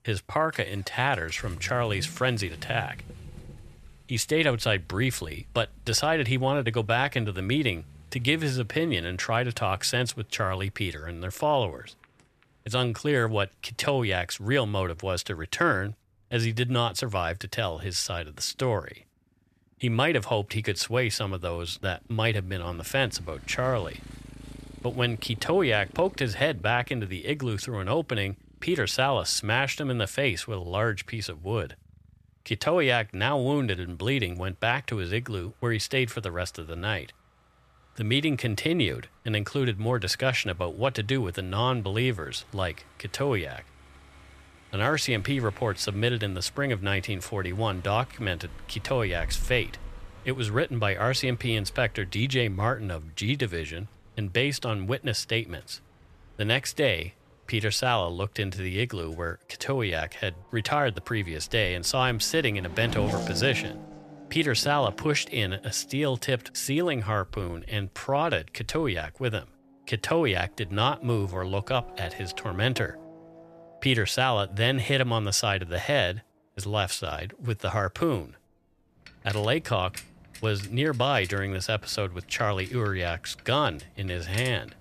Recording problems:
traffic noise; noticeable; throughout; 20 dB below the speech

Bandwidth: 14 kHz